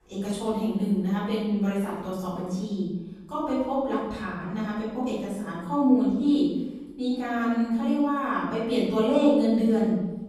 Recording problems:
room echo; strong; dies away in 1 s
off-mic speech; far

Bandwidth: 14 kHz